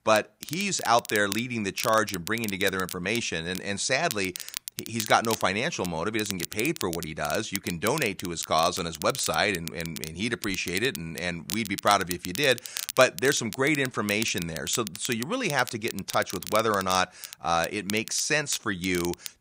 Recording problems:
crackle, like an old record; noticeable; 10 dB below the speech

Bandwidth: 15.5 kHz